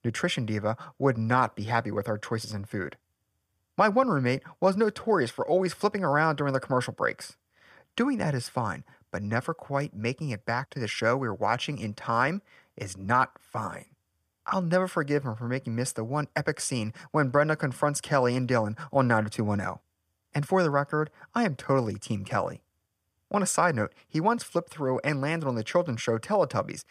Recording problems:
none

